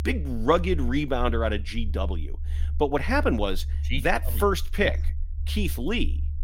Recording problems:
low rumble; faint; throughout; 25 dB below the speech

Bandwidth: 16 kHz